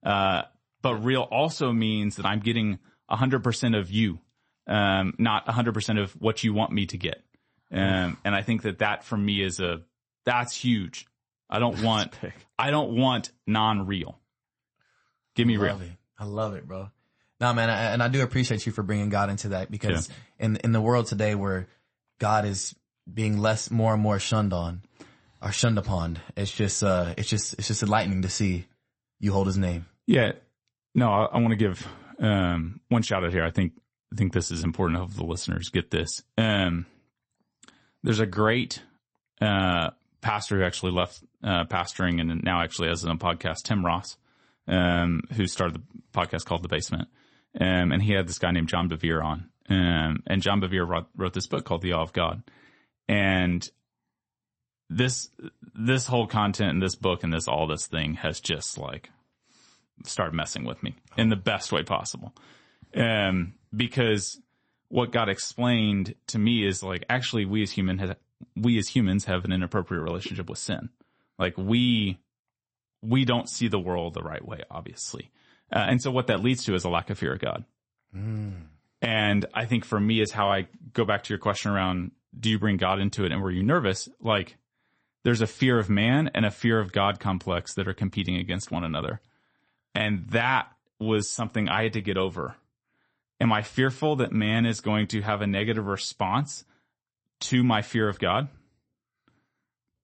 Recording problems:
garbled, watery; slightly; nothing above 8 kHz

